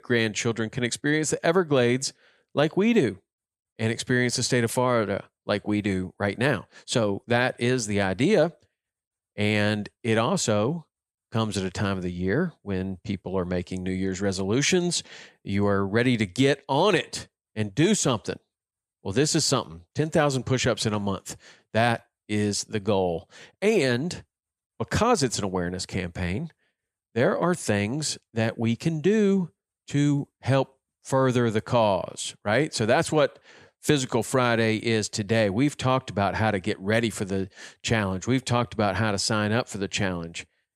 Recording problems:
none

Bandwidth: 14.5 kHz